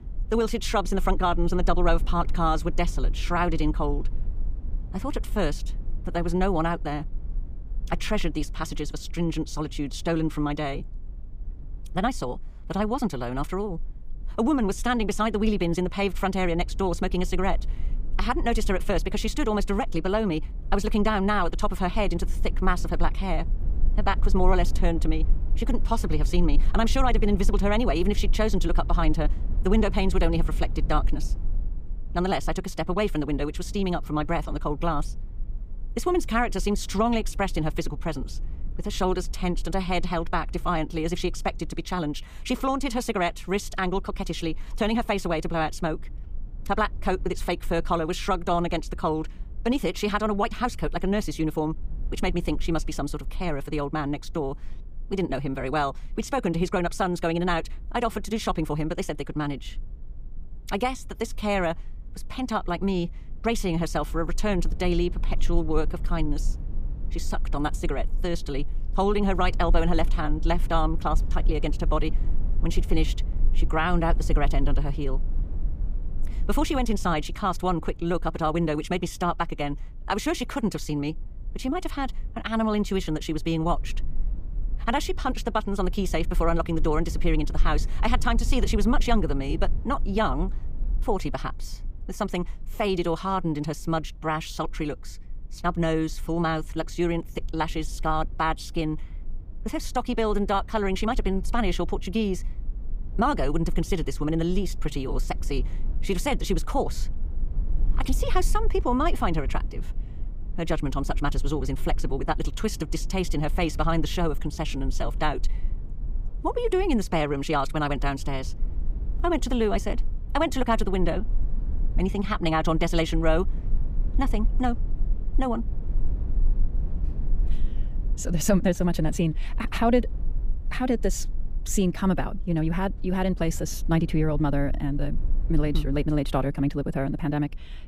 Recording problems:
wrong speed, natural pitch; too fast; 1.6 times normal speed
low rumble; faint; throughout; 25 dB below the speech

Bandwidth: 15 kHz